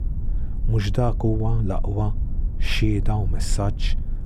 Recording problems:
low rumble; noticeable; throughout; 15 dB below the speech

